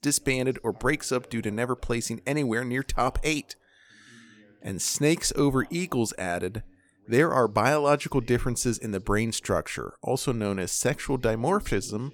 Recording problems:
voice in the background; faint; throughout; 30 dB below the speech

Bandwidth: 18 kHz